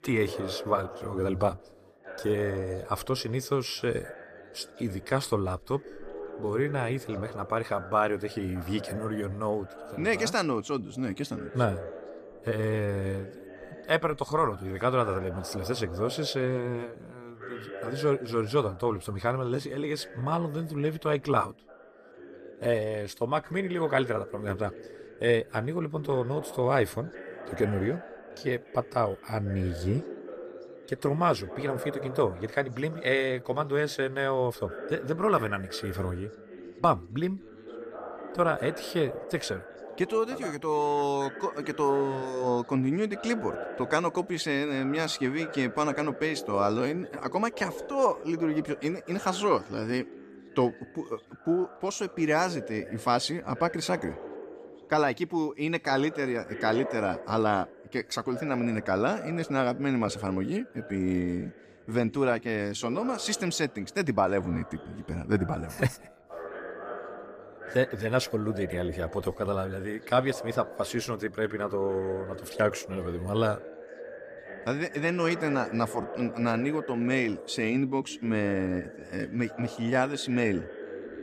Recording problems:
background chatter; noticeable; throughout; 2 voices, 15 dB below the speech

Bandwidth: 14.5 kHz